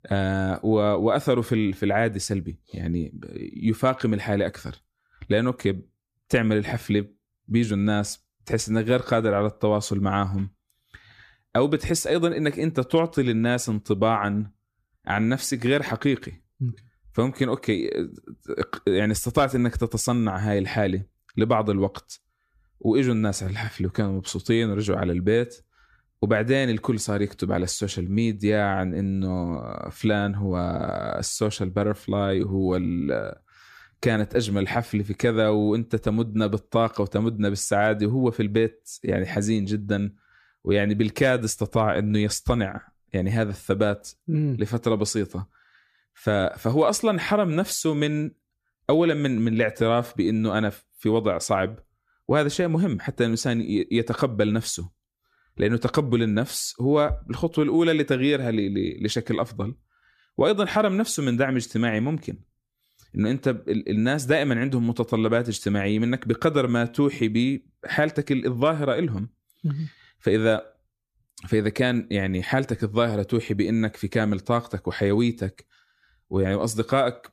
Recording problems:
none

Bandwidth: 14.5 kHz